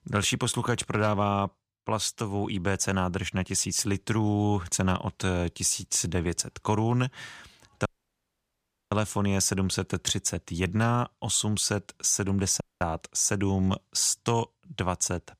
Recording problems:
audio cutting out; at 8 s for 1 s and at 13 s

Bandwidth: 14.5 kHz